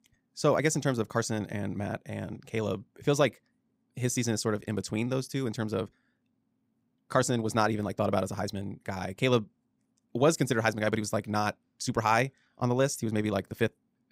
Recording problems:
wrong speed, natural pitch; too fast; 1.6 times normal speed

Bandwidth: 15.5 kHz